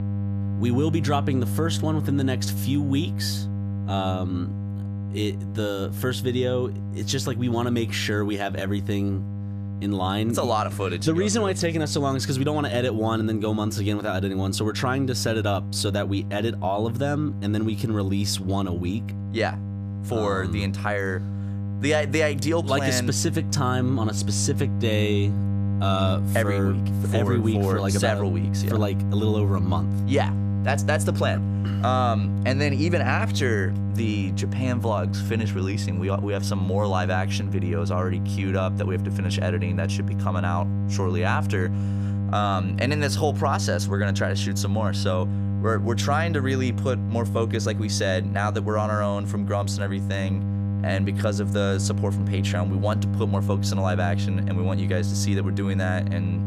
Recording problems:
electrical hum; noticeable; throughout; 50 Hz, 10 dB below the speech

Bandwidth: 14.5 kHz